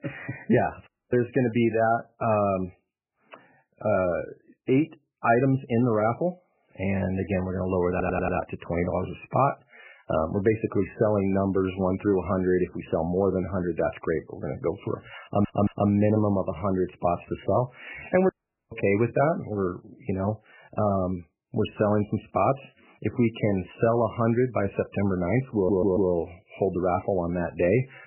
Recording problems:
garbled, watery; badly; nothing above 3 kHz
audio cutting out; at 1 s and at 18 s
audio stuttering; at 8 s, at 15 s and at 26 s

